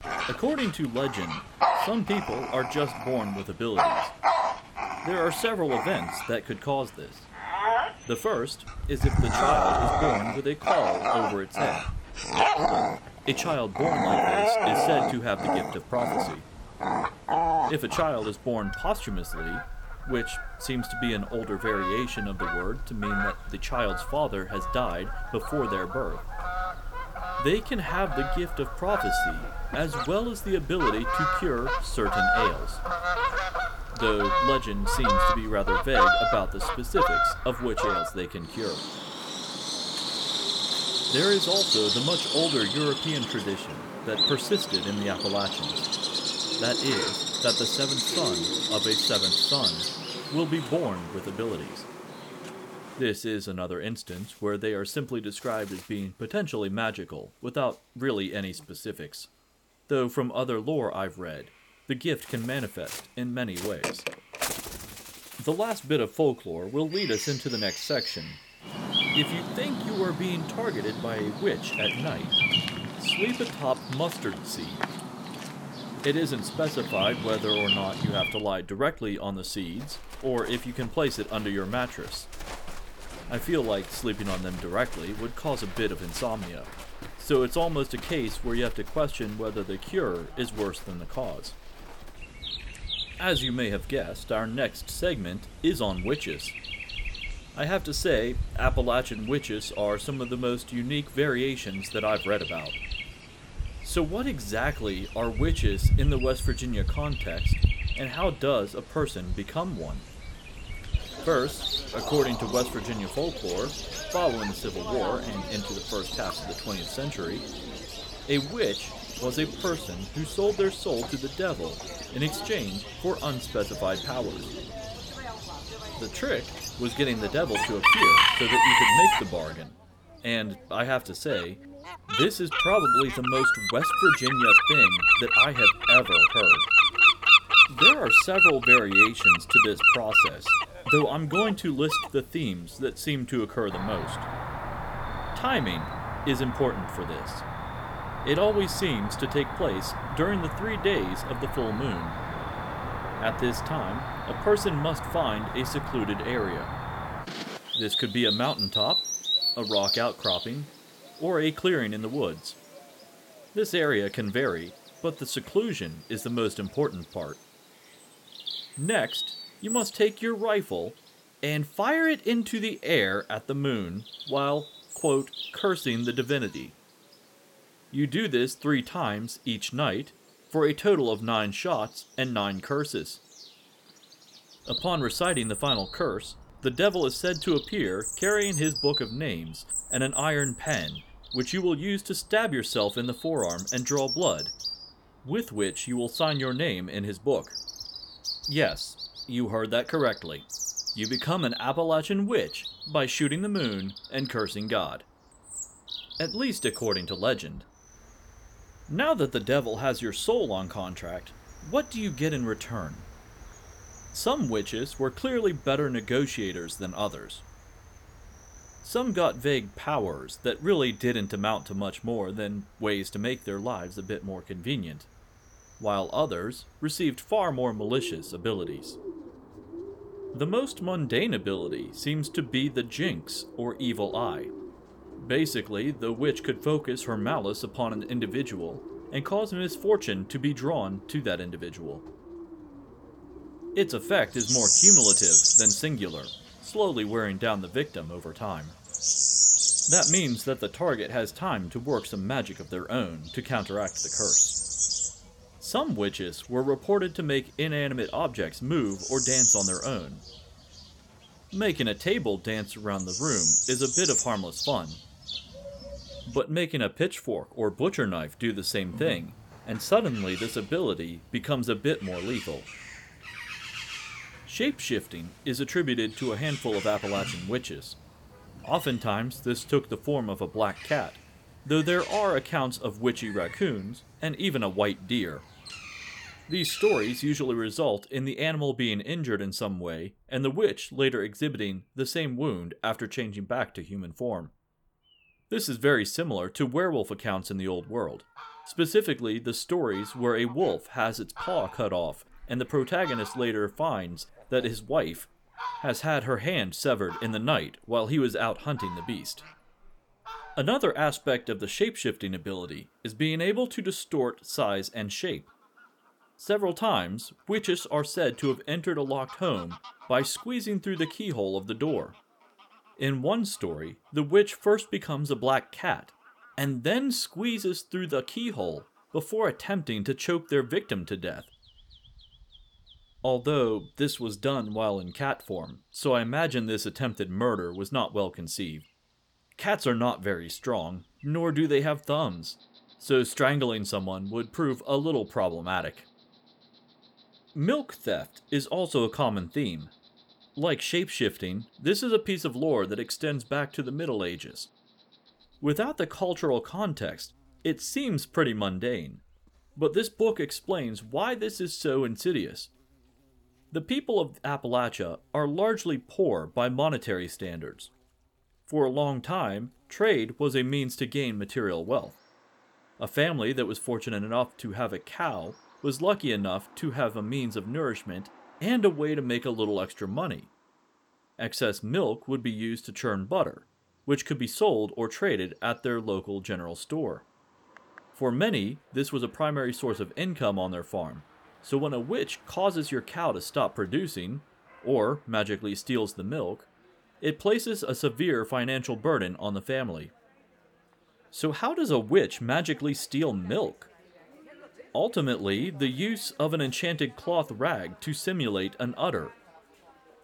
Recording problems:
animal sounds; very loud; throughout; 3 dB above the speech

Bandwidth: 18.5 kHz